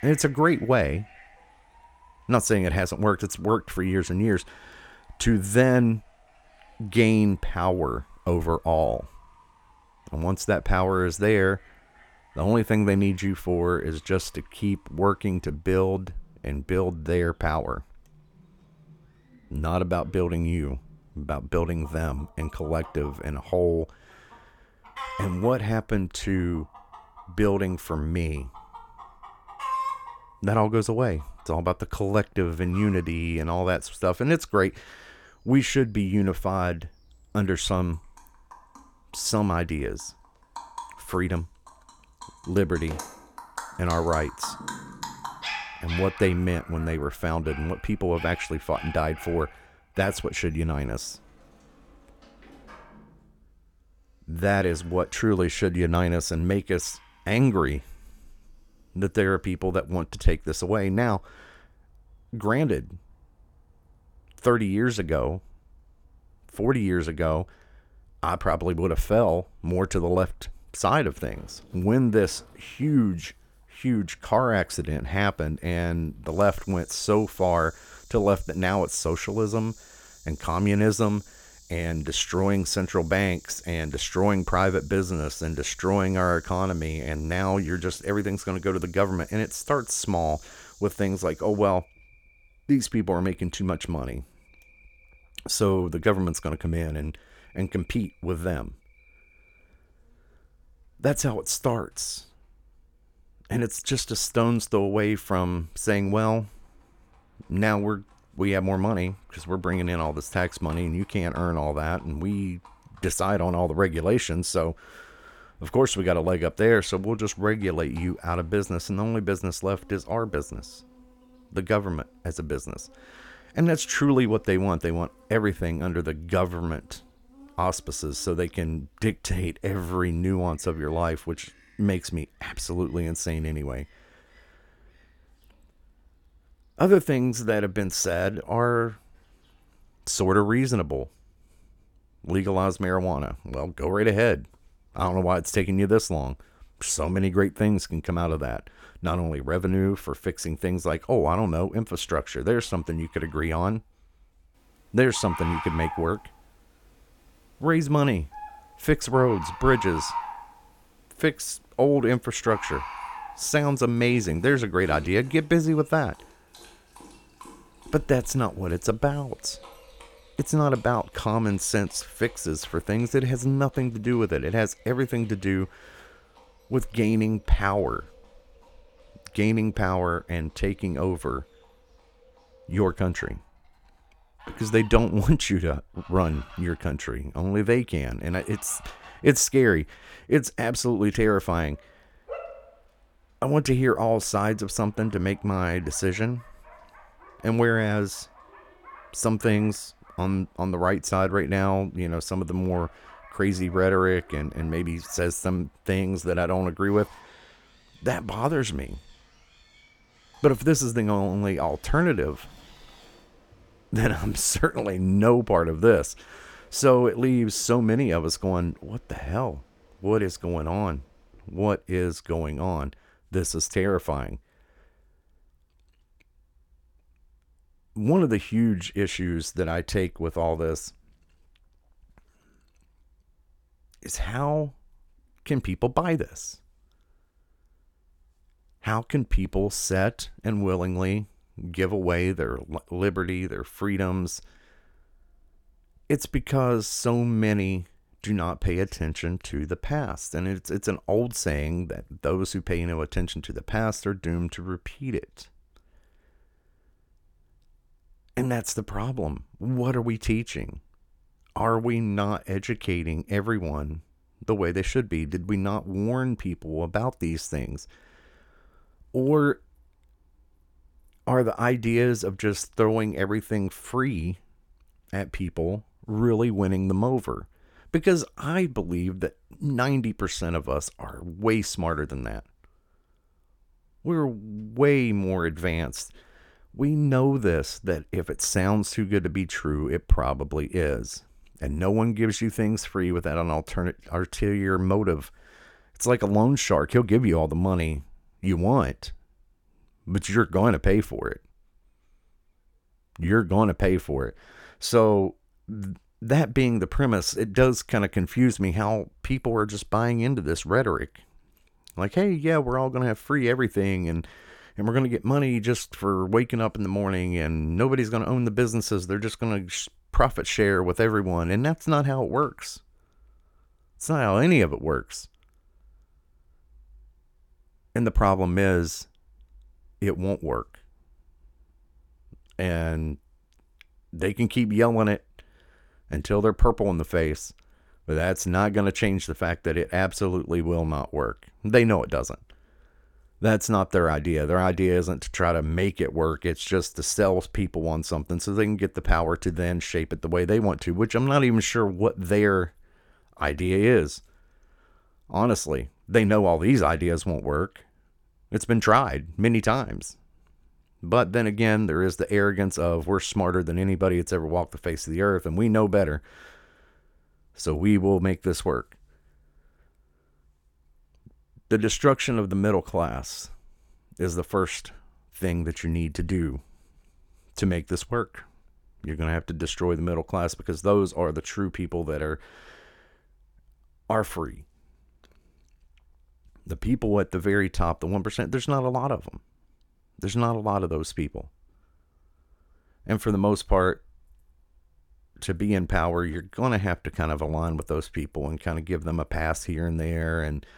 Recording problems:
animal sounds; noticeable; until 3:41; 20 dB below the speech

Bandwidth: 18 kHz